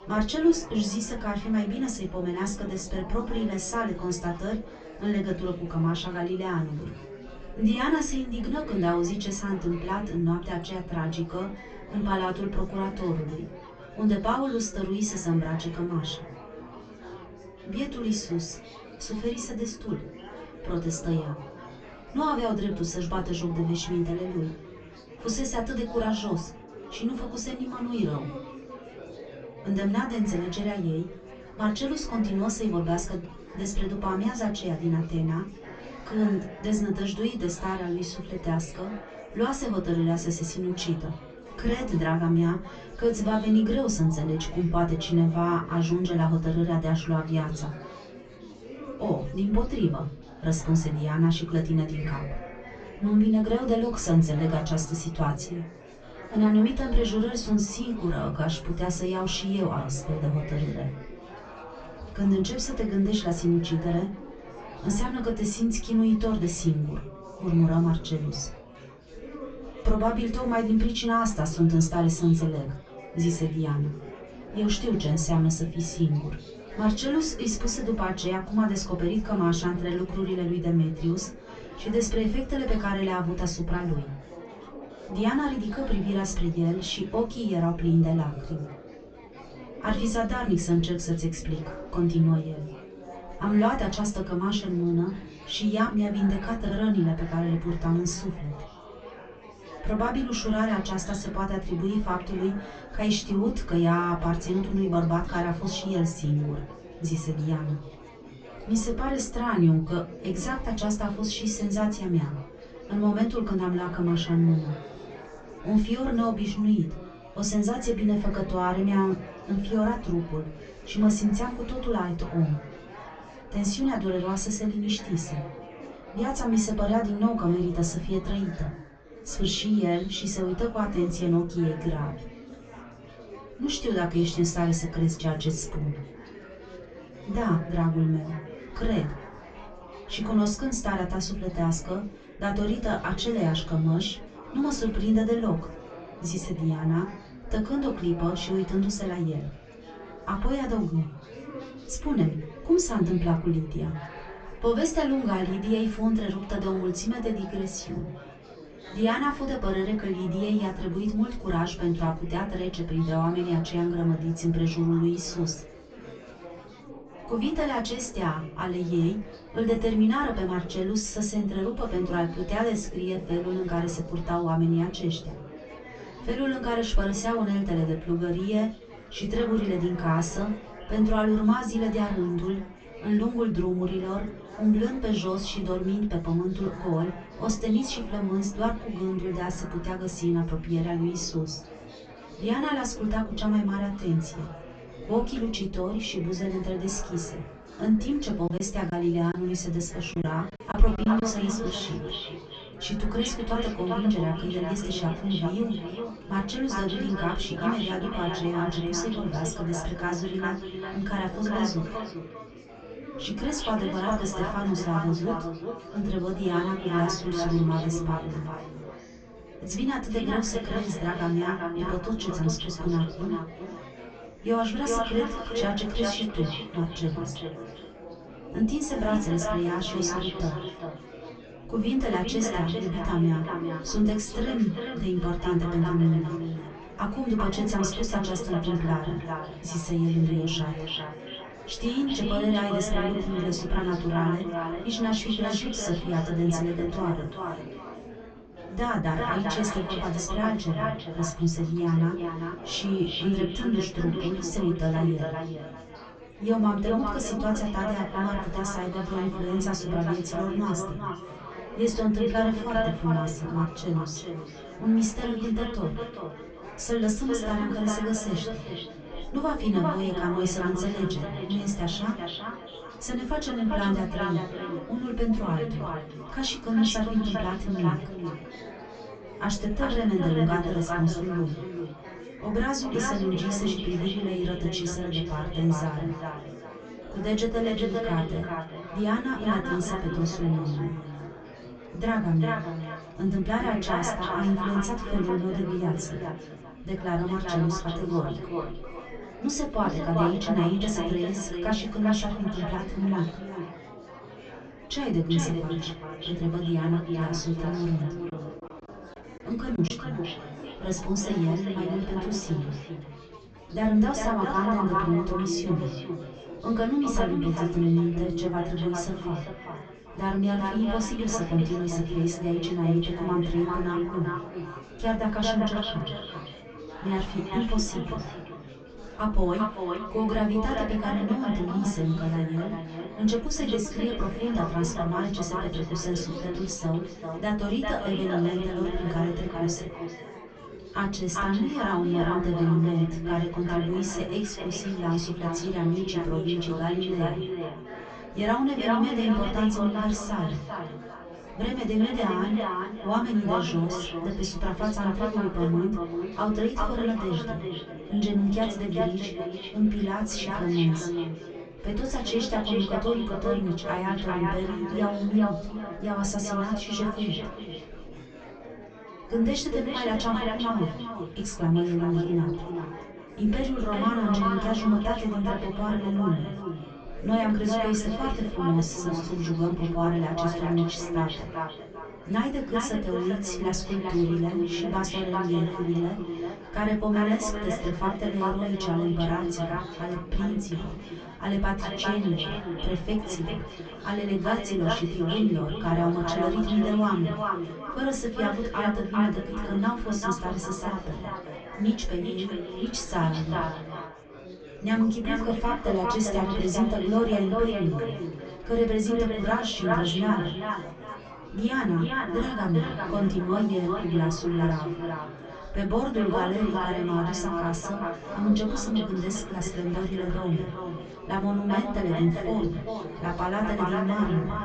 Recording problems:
echo of what is said; strong; from 3:21 on; 400 ms later, 6 dB below the speech
off-mic speech; far
high frequencies cut off; noticeable; nothing above 8 kHz
room echo; very slight; dies away in 0.2 s
chatter from many people; noticeable; throughout; 15 dB below the speech
choppy; very; from 3:18 to 3:21 and at 5:10; 8% of the speech affected

